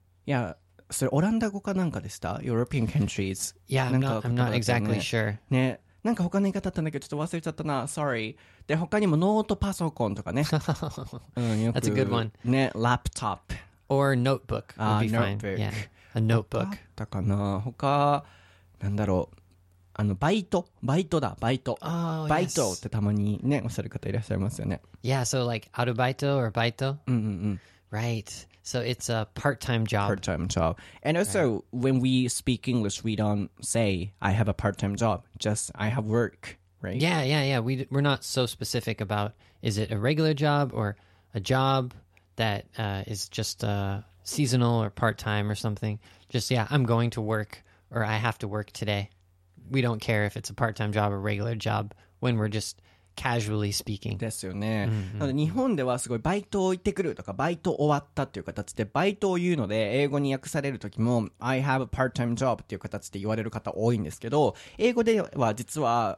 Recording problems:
none

